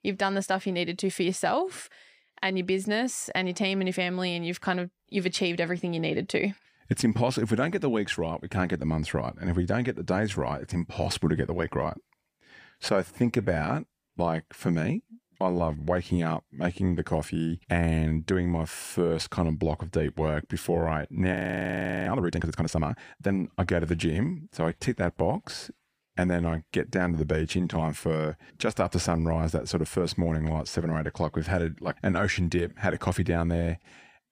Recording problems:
audio freezing; at 21 s for 0.5 s

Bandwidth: 15 kHz